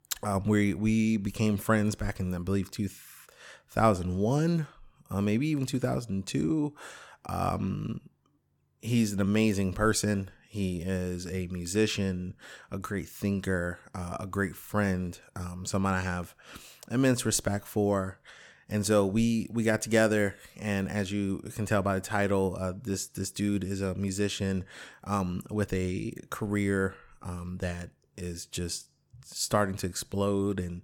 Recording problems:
none

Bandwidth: 18 kHz